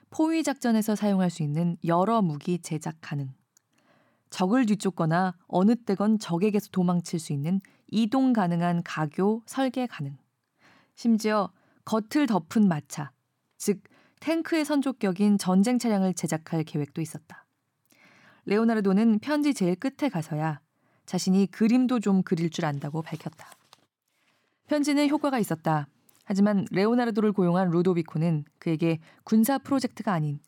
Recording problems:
none

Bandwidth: 17 kHz